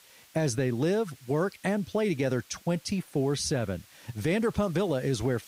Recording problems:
hiss; faint; throughout; 25 dB below the speech

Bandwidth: 15.5 kHz